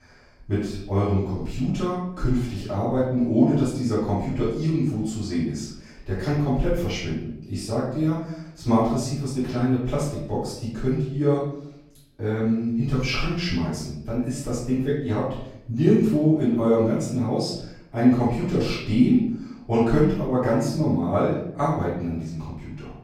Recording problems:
off-mic speech; far
room echo; noticeable; dies away in 0.7 s

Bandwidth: 16 kHz